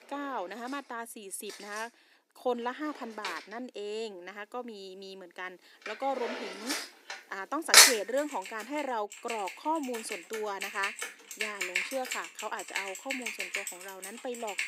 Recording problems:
thin; somewhat; fading below 300 Hz
household noises; very loud; throughout; 10 dB above the speech

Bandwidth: 15.5 kHz